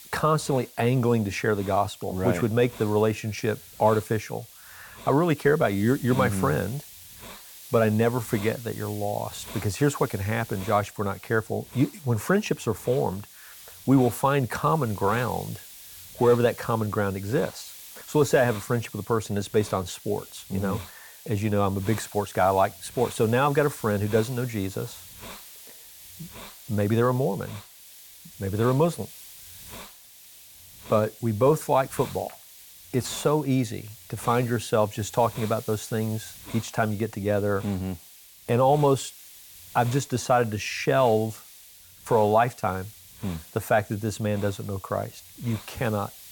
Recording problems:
hiss; noticeable; throughout; 15 dB below the speech

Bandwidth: 18 kHz